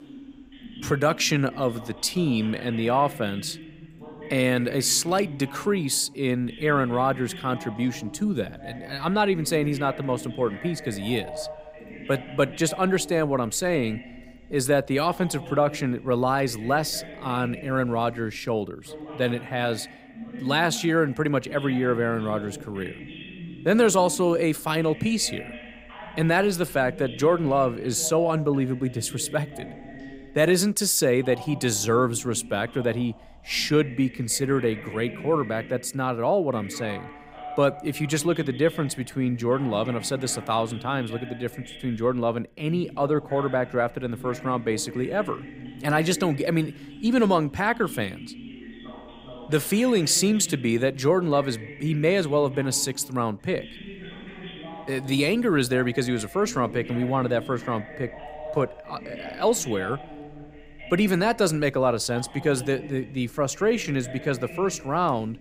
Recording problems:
voice in the background; noticeable; throughout; 15 dB below the speech

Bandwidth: 15.5 kHz